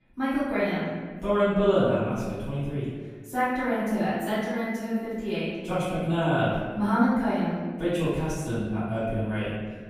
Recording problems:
room echo; strong; dies away in 1.5 s
off-mic speech; far

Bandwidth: 15 kHz